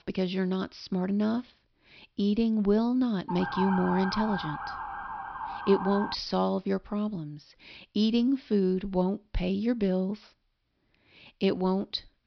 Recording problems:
high frequencies cut off; noticeable; nothing above 5.5 kHz
siren; noticeable; from 3.5 to 6 s; peak 3 dB below the speech

